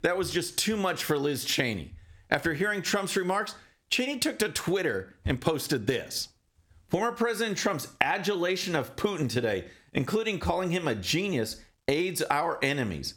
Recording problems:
squashed, flat; somewhat

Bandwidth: 17.5 kHz